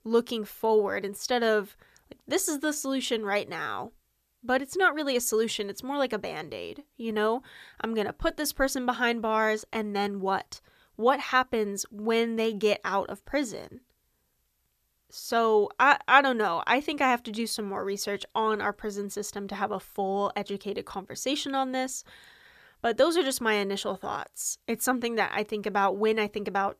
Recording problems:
none

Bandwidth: 14.5 kHz